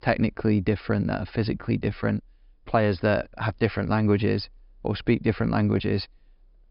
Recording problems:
high frequencies cut off; noticeable; nothing above 5.5 kHz

